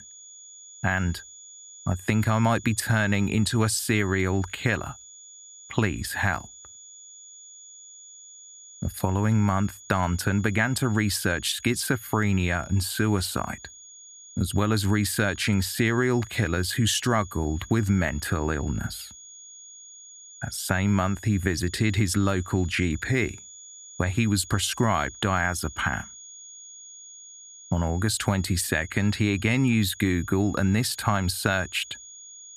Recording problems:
high-pitched whine; noticeable; throughout; 6.5 kHz, 20 dB below the speech

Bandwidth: 14.5 kHz